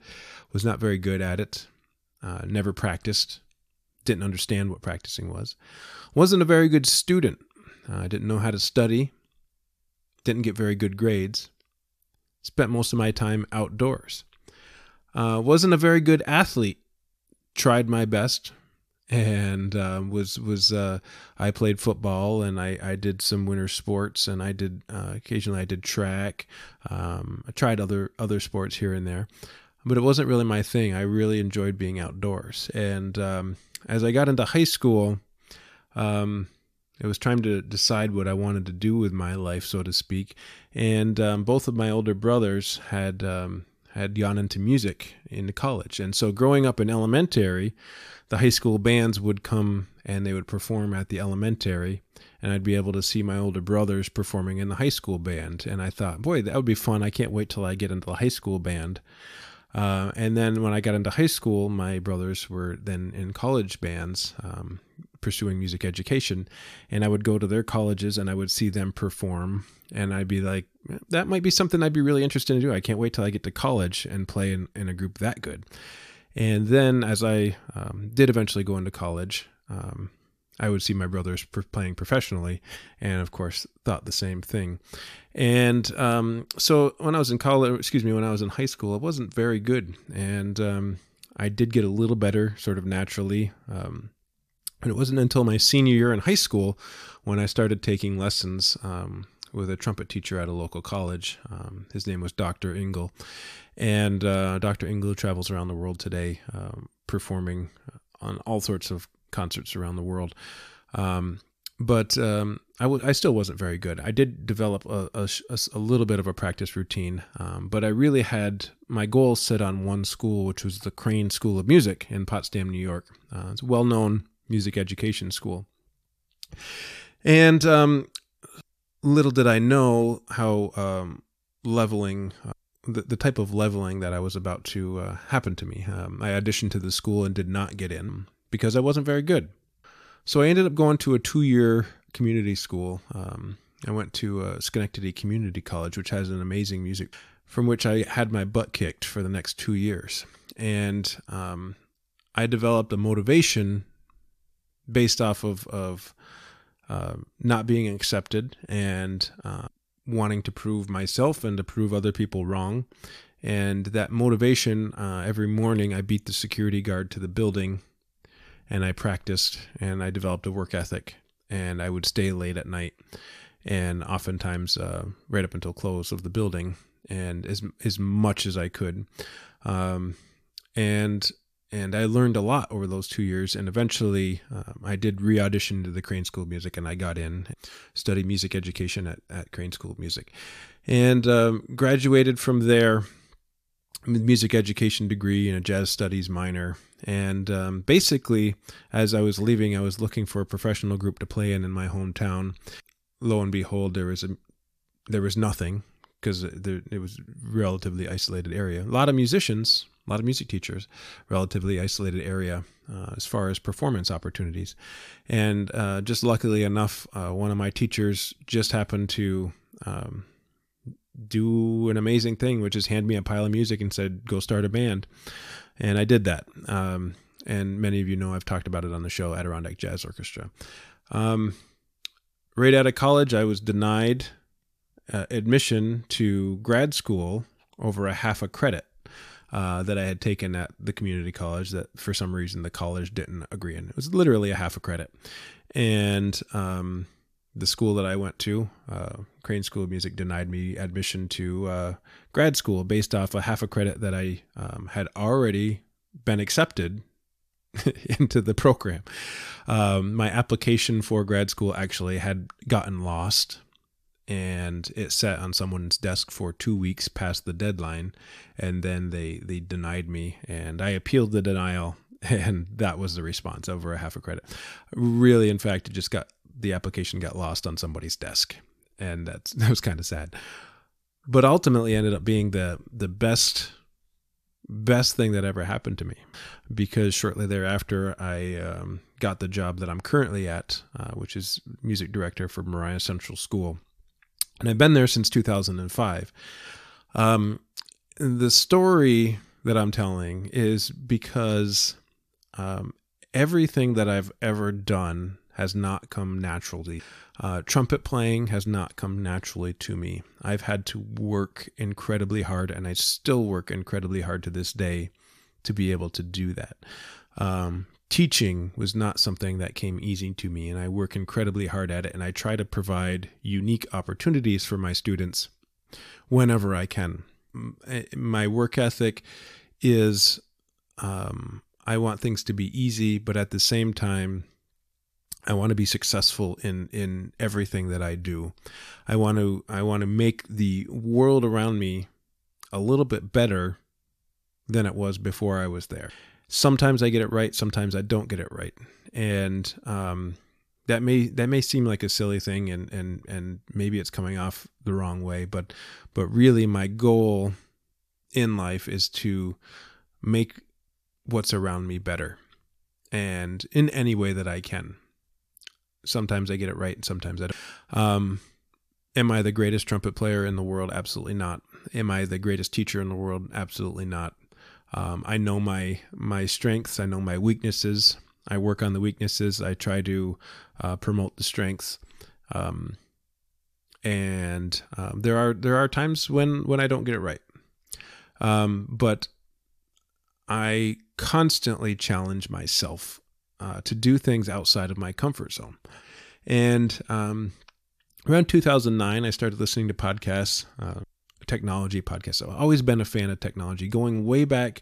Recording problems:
none

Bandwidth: 14.5 kHz